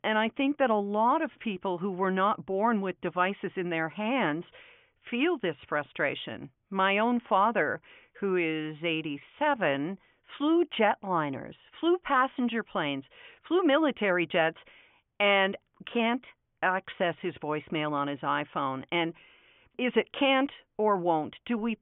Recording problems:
high frequencies cut off; severe; nothing above 3.5 kHz

